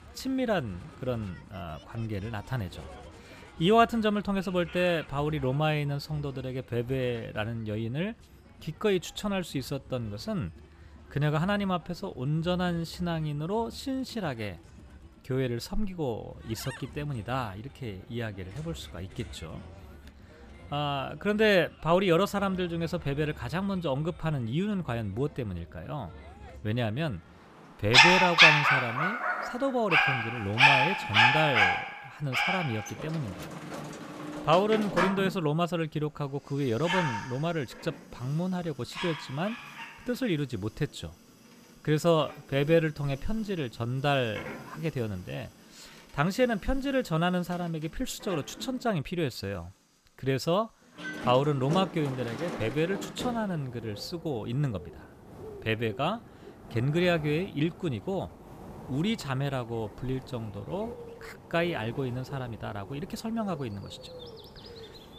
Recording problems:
animal sounds; very loud; throughout; 4 dB above the speech

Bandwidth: 14.5 kHz